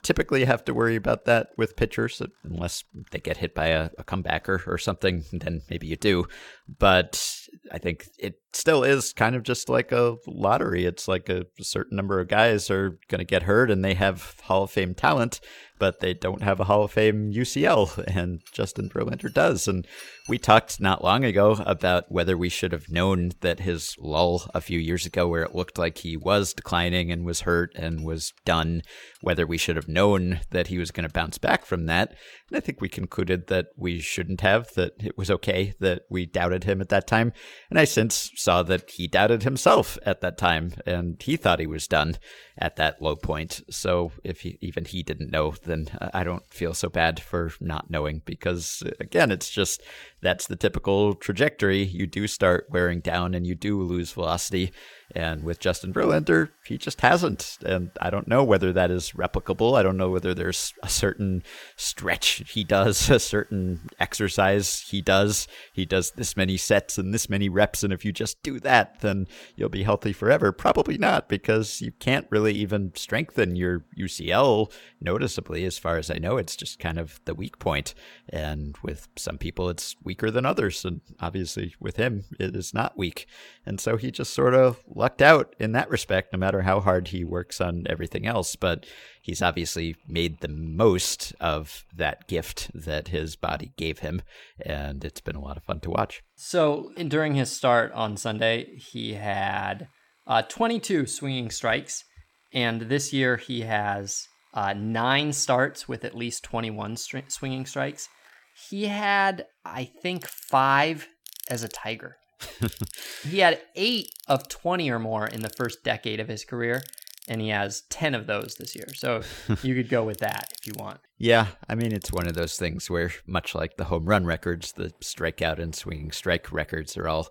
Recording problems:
machinery noise; faint; throughout; 25 dB below the speech

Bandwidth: 17 kHz